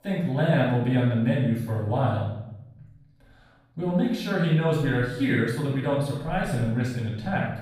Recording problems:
off-mic speech; far
room echo; noticeable; dies away in 0.8 s

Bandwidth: 15 kHz